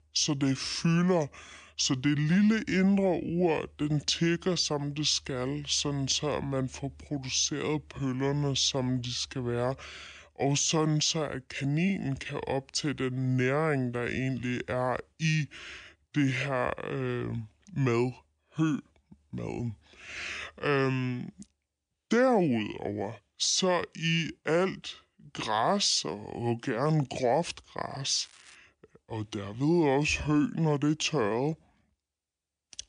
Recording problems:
wrong speed and pitch; too slow and too low; 0.7 times normal speed
crackling; faint; at 28 s; 25 dB below the speech

